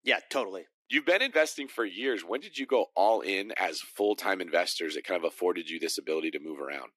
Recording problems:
thin; somewhat; fading below 300 Hz

